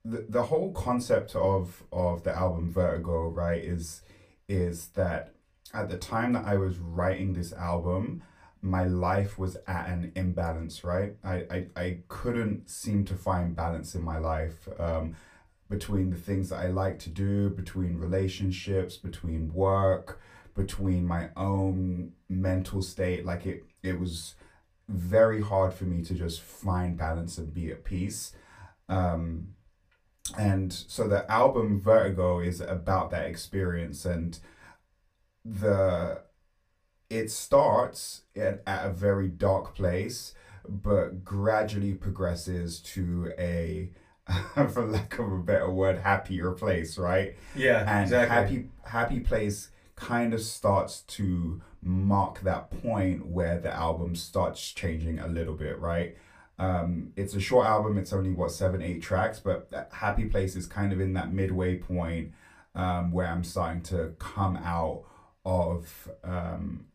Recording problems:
off-mic speech; far
room echo; very slight; dies away in 0.2 s

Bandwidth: 15 kHz